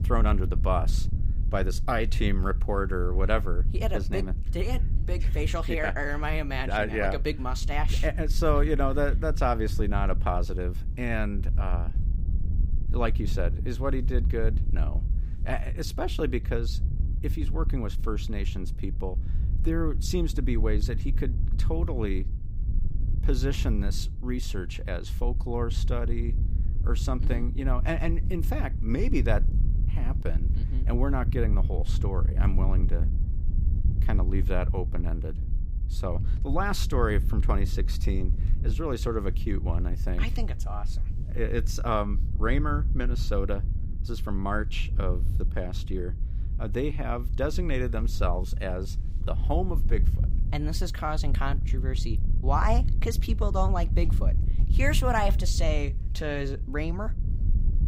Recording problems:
wind noise on the microphone; occasional gusts; 15 dB below the speech

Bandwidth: 15.5 kHz